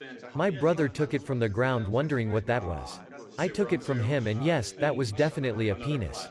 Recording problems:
background chatter; noticeable; throughout; 4 voices, 15 dB below the speech

